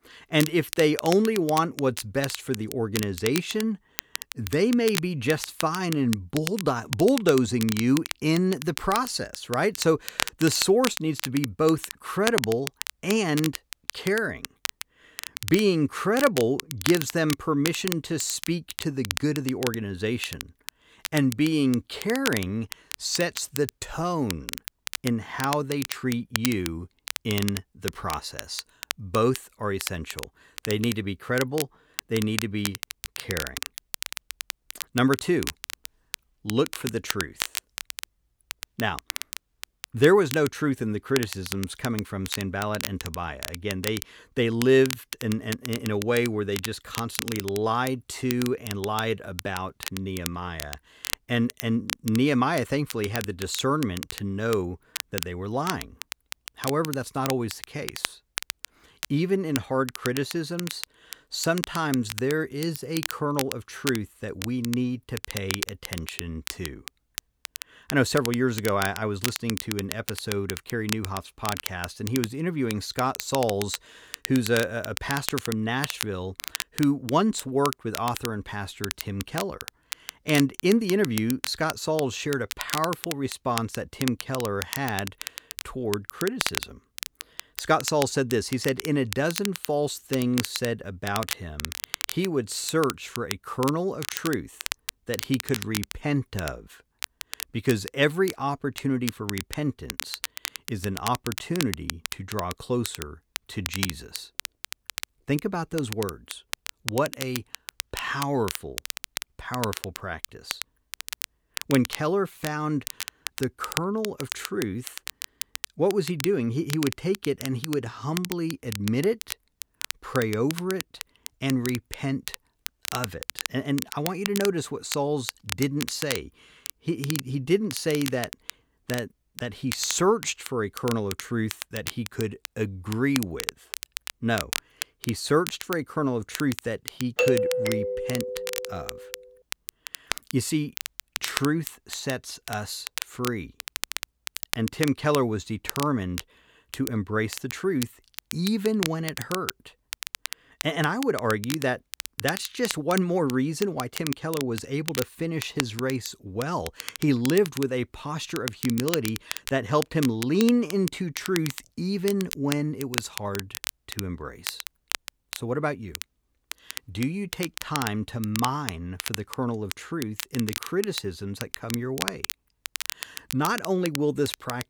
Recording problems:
crackle, like an old record; loud; 8 dB below the speech
doorbell; loud; from 2:17 to 2:19; peak 4 dB above the speech

